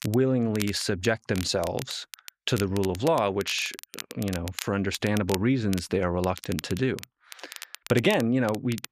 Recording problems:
crackle, like an old record; noticeable; 15 dB below the speech

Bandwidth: 14.5 kHz